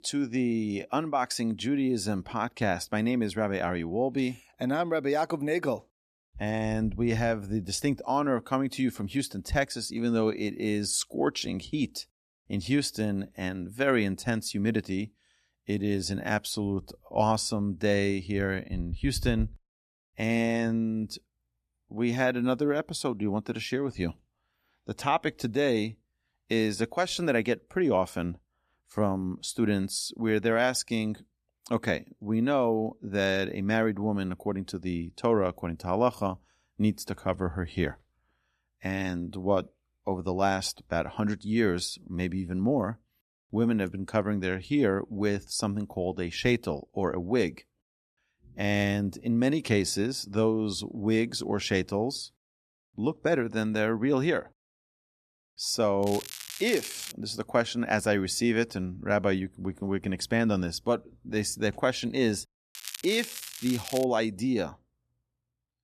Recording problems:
crackling; noticeable; from 56 to 57 s and from 1:03 to 1:04; 10 dB below the speech

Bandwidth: 14 kHz